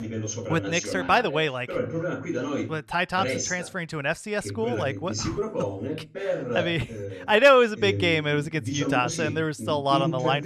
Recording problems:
voice in the background; loud; throughout; 7 dB below the speech

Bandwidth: 14.5 kHz